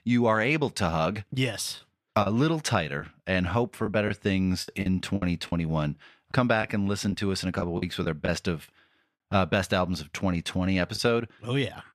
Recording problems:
choppy; very; 5% of the speech affected

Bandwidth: 14.5 kHz